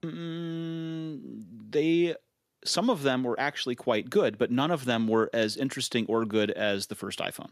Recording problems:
none

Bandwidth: 14.5 kHz